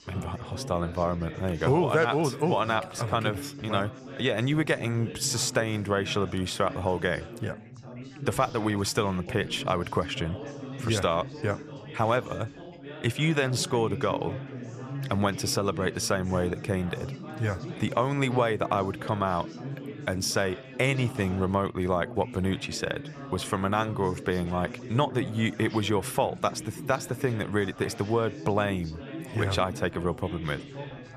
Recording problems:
background chatter; noticeable; throughout; 4 voices, 10 dB below the speech

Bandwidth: 14.5 kHz